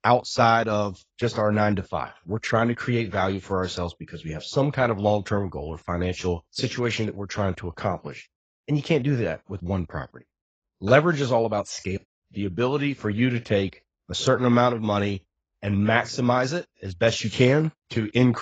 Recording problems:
garbled, watery; badly; nothing above 7.5 kHz
abrupt cut into speech; at the end

